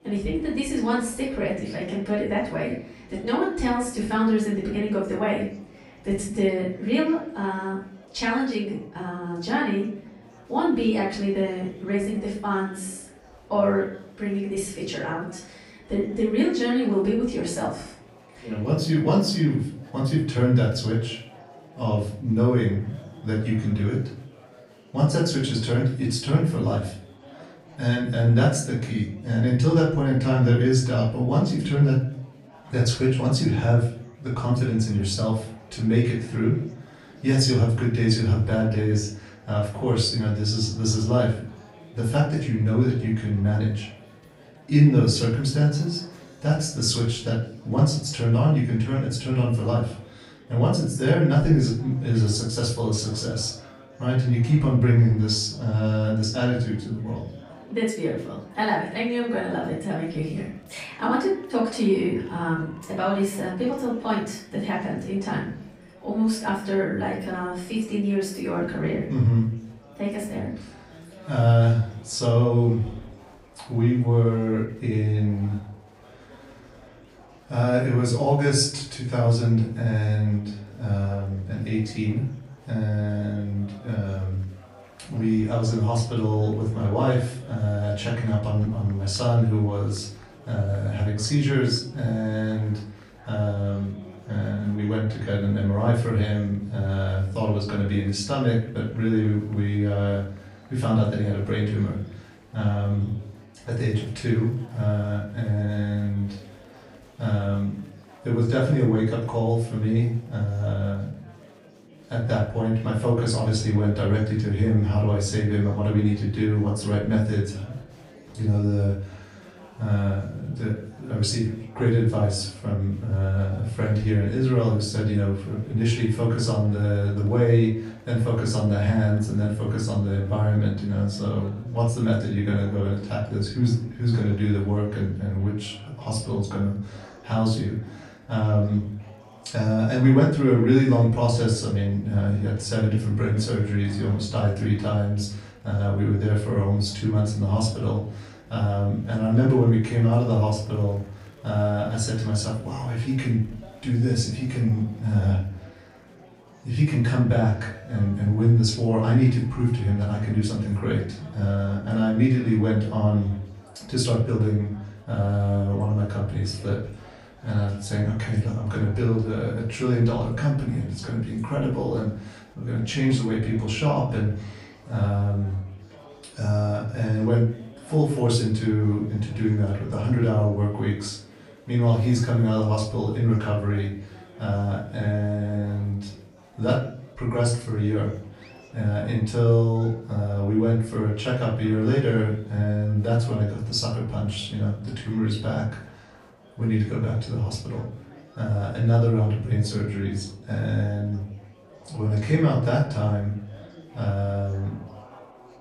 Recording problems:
off-mic speech; far
room echo; noticeable; dies away in 0.5 s
chatter from many people; faint; throughout; 25 dB below the speech

